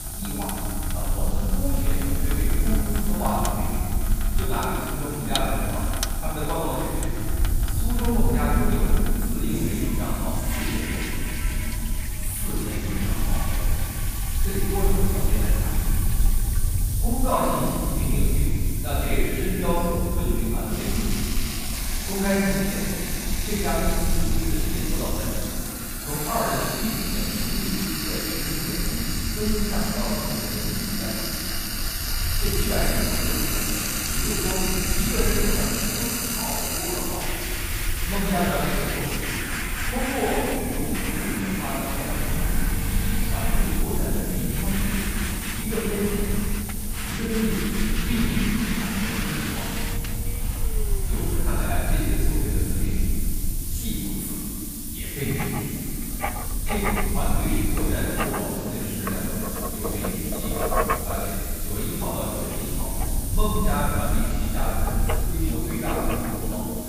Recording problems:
room echo; strong; dies away in 2.8 s
off-mic speech; far
household noises; loud; throughout; 2 dB below the speech
hiss; loud; throughout; 5 dB below the speech
low rumble; noticeable; throughout; 15 dB below the speech

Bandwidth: 15 kHz